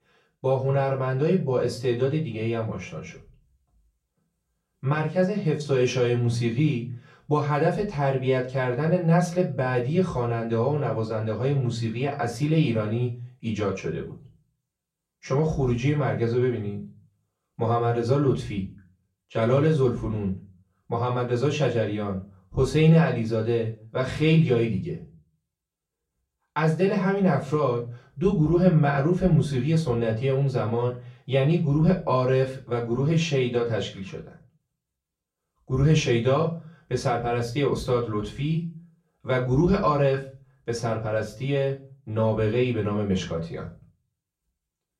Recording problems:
off-mic speech; far
room echo; very slight; dies away in 0.3 s

